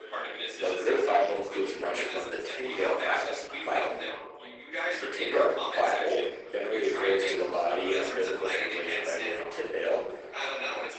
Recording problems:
off-mic speech; far
garbled, watery; badly; nothing above 8 kHz
thin; very; fading below 350 Hz
room echo; noticeable; dies away in 0.6 s
background chatter; loud; throughout; 4 voices, 5 dB below the speech

